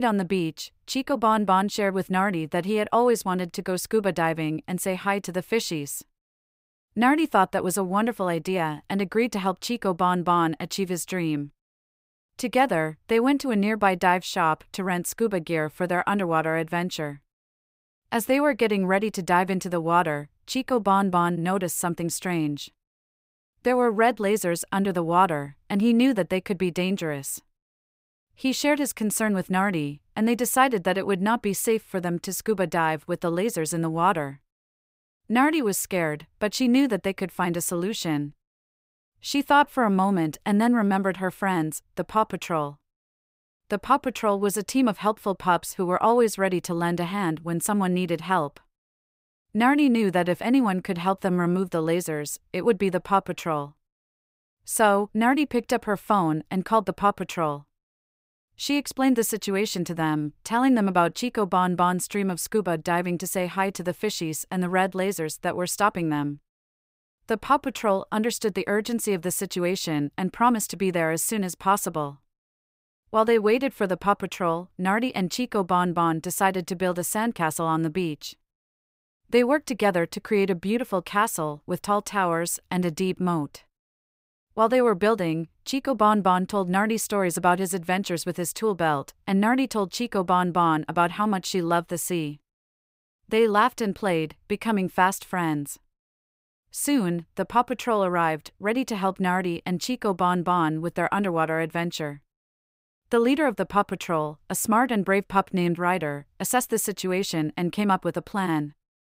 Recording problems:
abrupt cut into speech; at the start

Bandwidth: 15.5 kHz